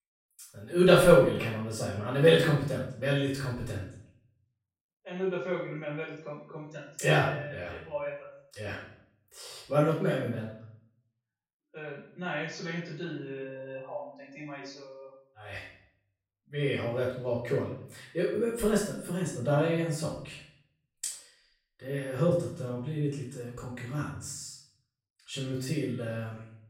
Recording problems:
off-mic speech; far
room echo; noticeable; dies away in 0.6 s

